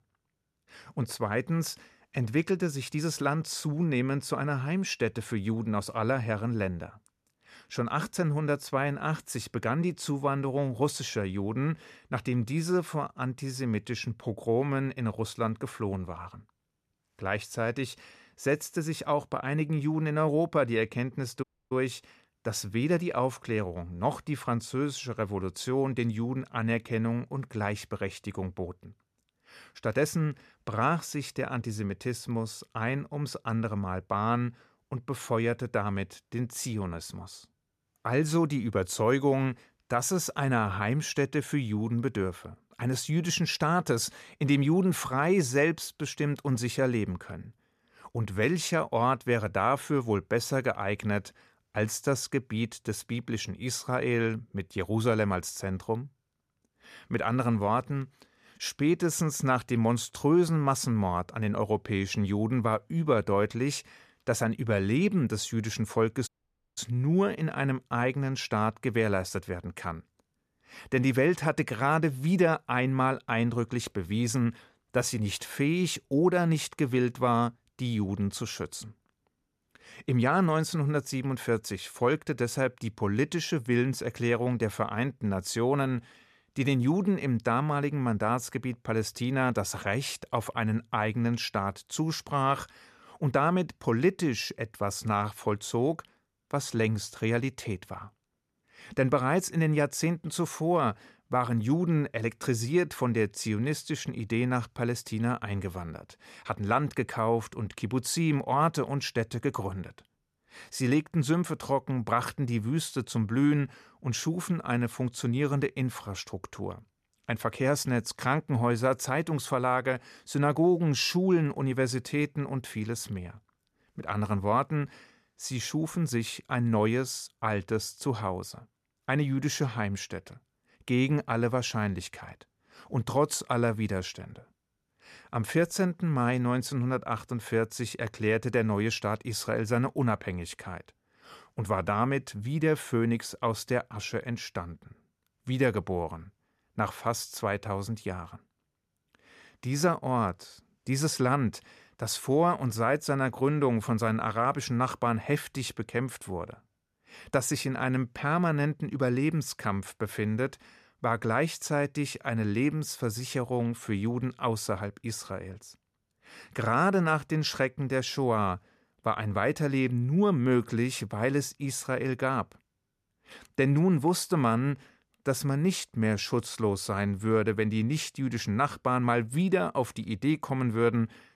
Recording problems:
audio cutting out; at 21 s and at 1:06

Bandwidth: 14.5 kHz